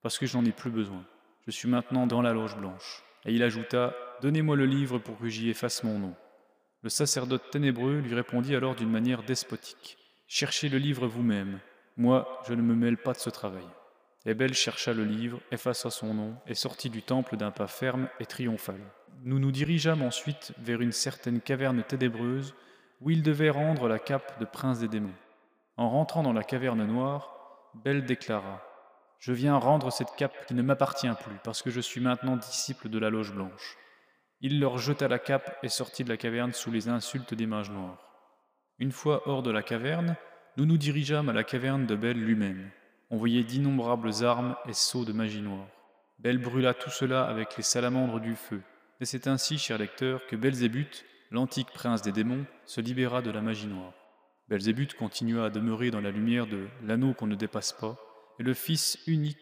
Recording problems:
echo of what is said; noticeable; throughout; 120 ms later, 15 dB below the speech

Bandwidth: 15 kHz